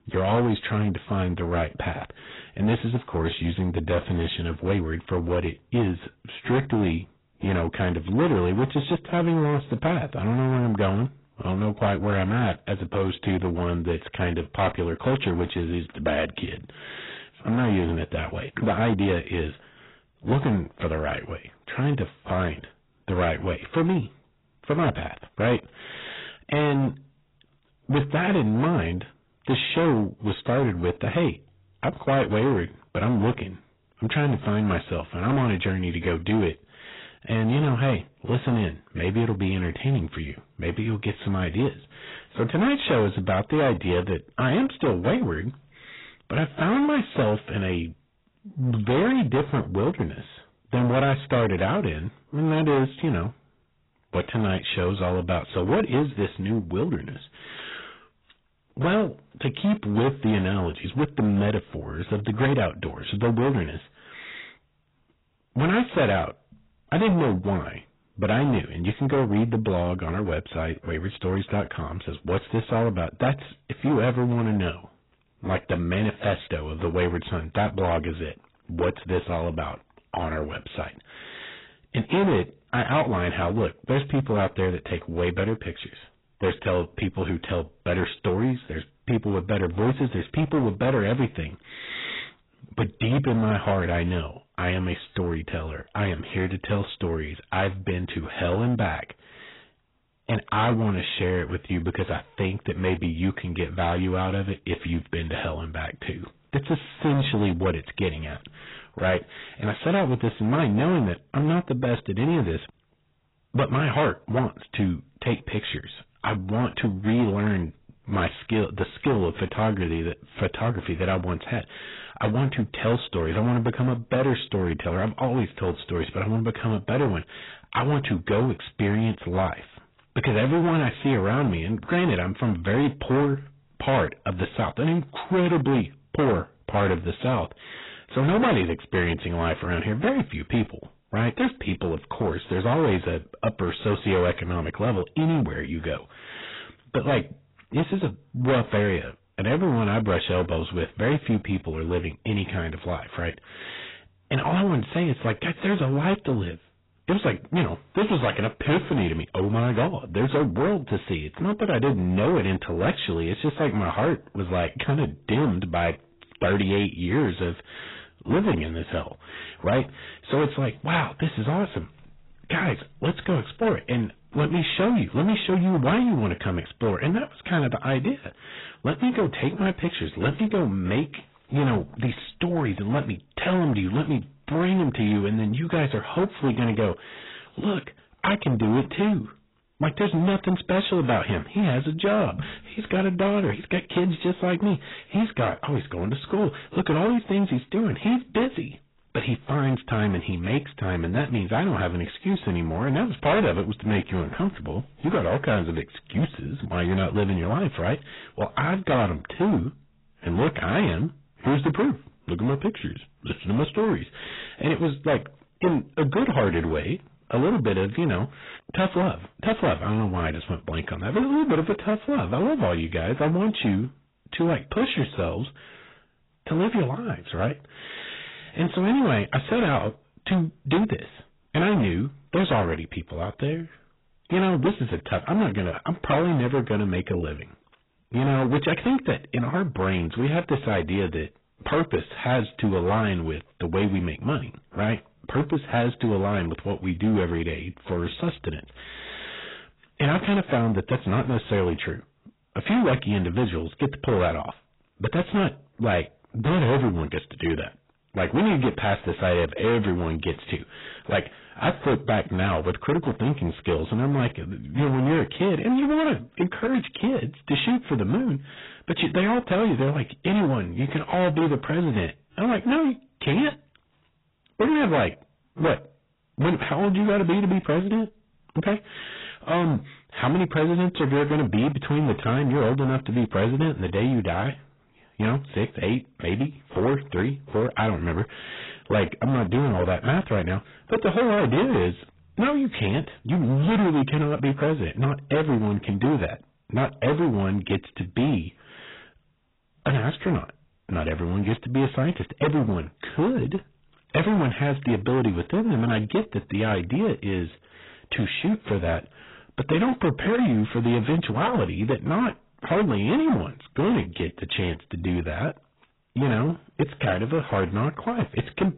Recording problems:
distortion; heavy; 11% of the sound clipped
garbled, watery; badly; nothing above 4 kHz

